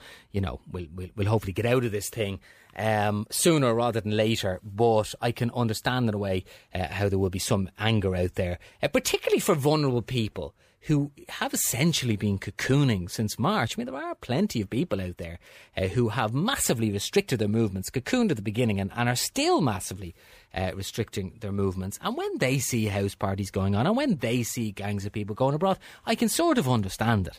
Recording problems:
none

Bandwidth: 15 kHz